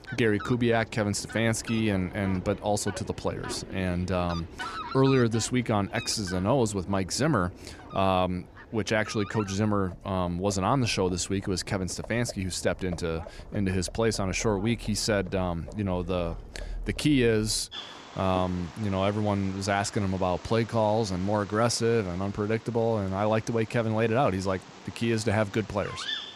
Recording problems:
animal sounds; noticeable; throughout; 15 dB below the speech

